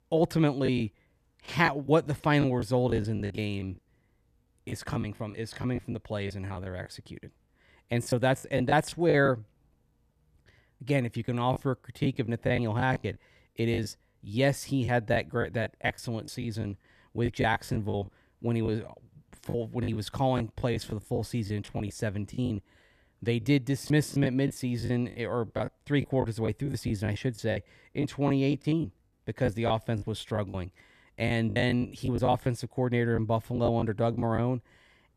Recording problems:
choppy; very; 12% of the speech affected

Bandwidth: 14.5 kHz